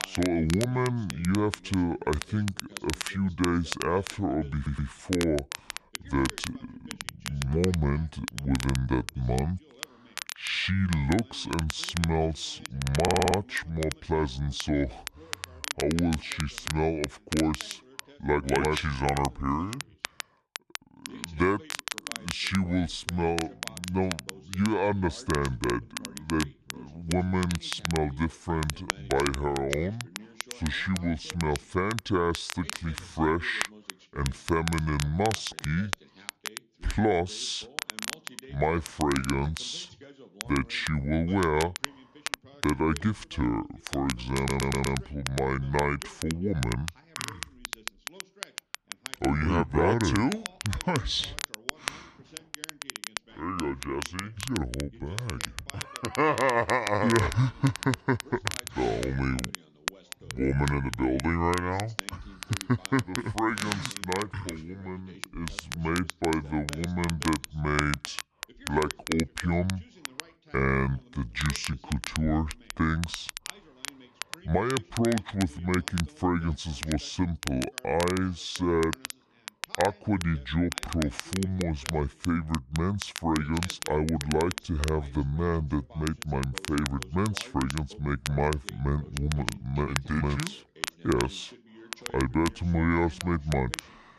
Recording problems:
wrong speed and pitch; too slow and too low; 0.6 times normal speed
crackle, like an old record; loud; 9 dB below the speech
voice in the background; faint; throughout; 25 dB below the speech
audio stuttering; at 4.5 s, at 13 s and at 44 s

